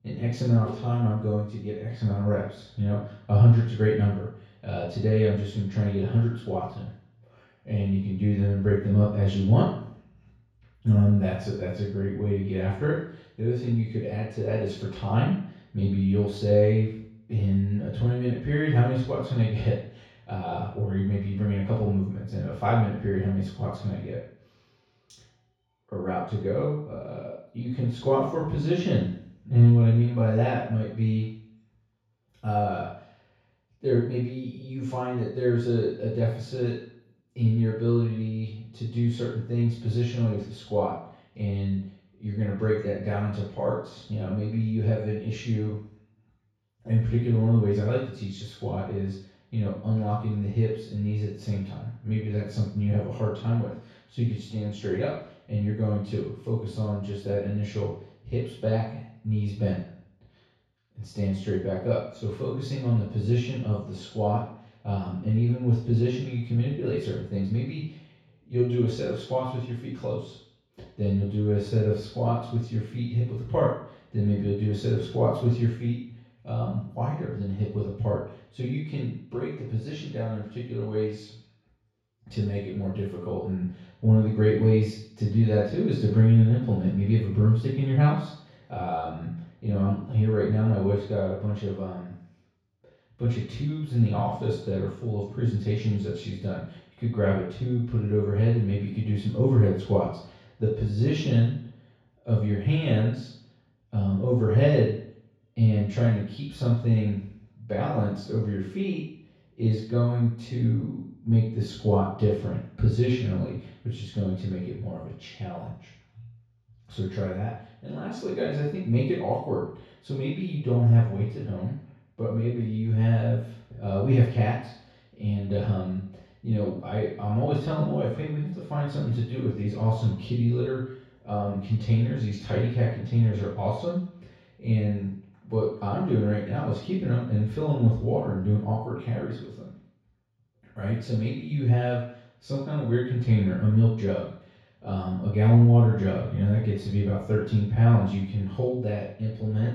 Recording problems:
off-mic speech; far
room echo; noticeable; dies away in 0.6 s

